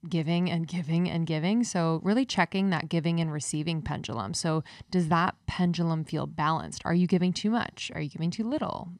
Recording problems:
none

